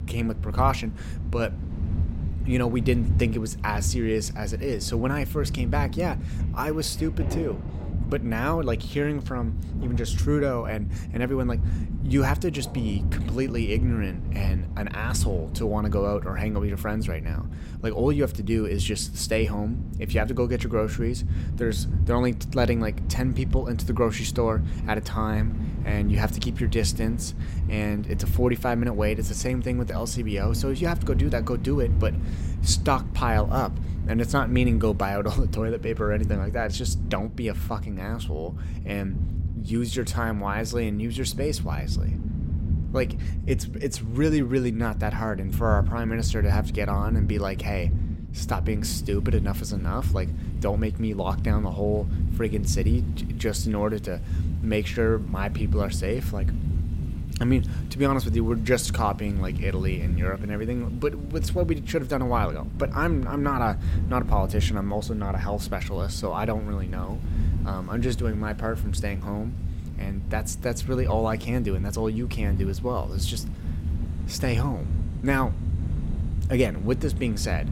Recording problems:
low rumble; noticeable; throughout; 15 dB below the speech
rain or running water; faint; throughout; 20 dB below the speech

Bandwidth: 16 kHz